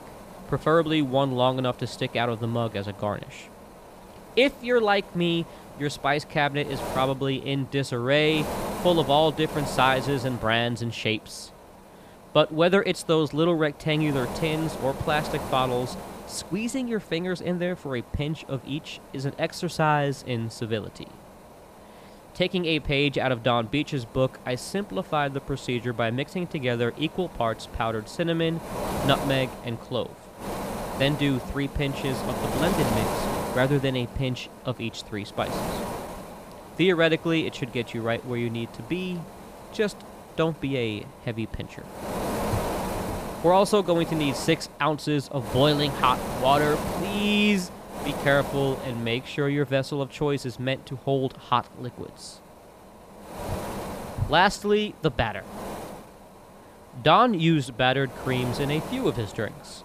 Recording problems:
wind noise on the microphone; heavy; 10 dB below the speech

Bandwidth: 15 kHz